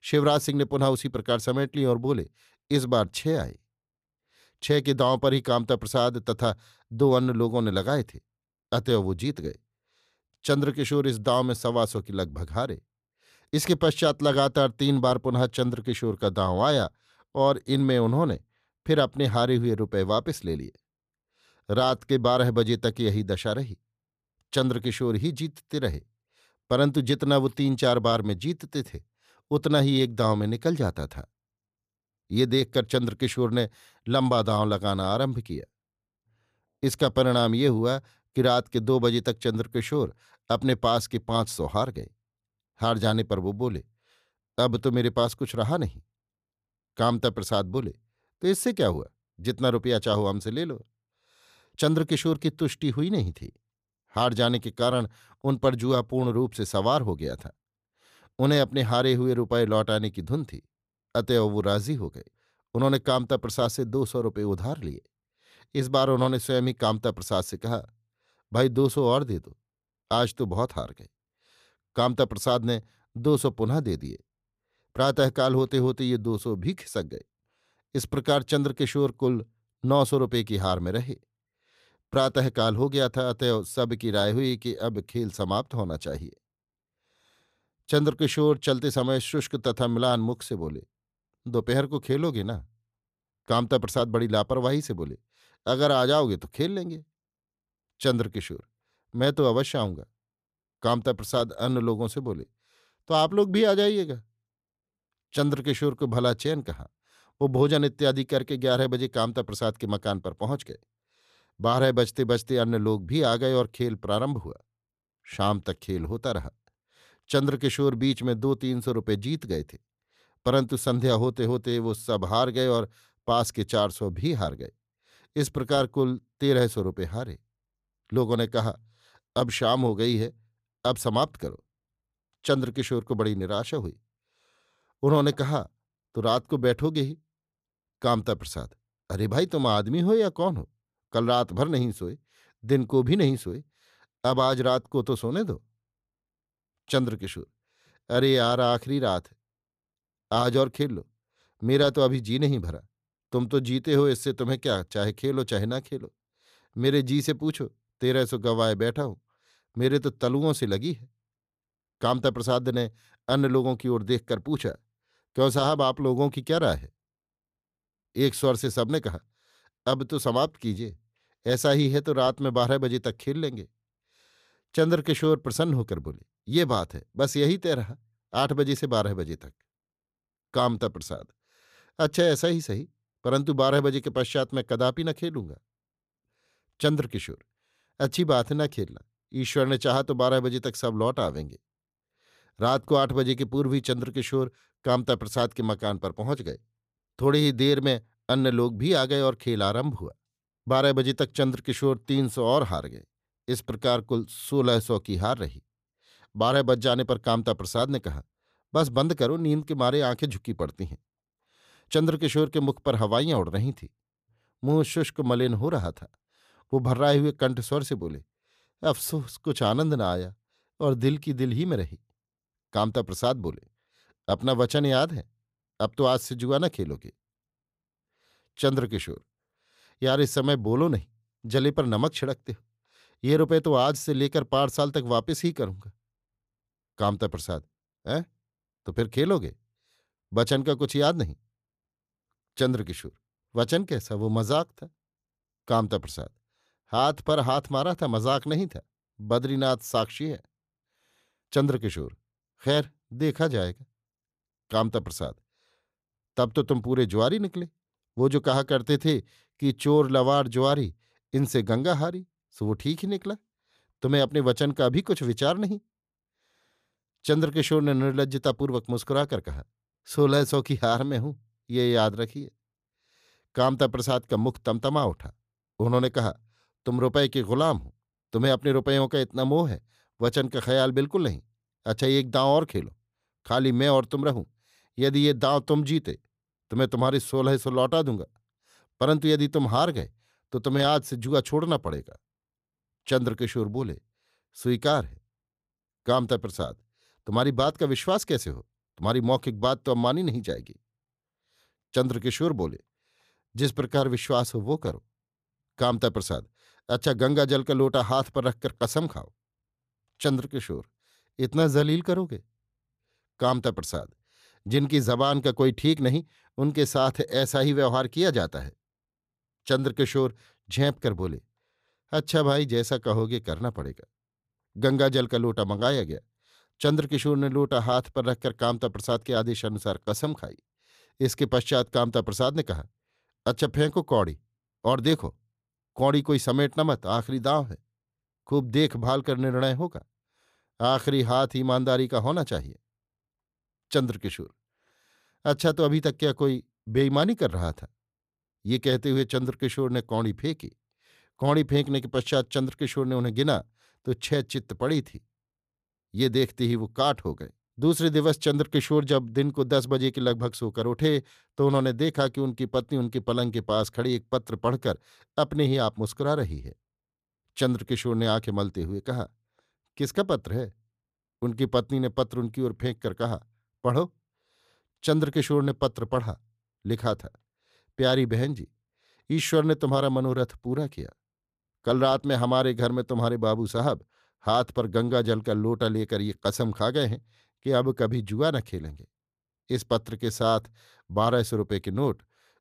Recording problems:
none

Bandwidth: 14.5 kHz